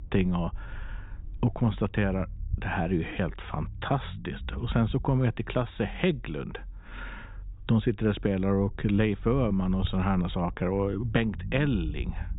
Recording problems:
high frequencies cut off; severe; nothing above 4 kHz
low rumble; faint; throughout; 25 dB below the speech

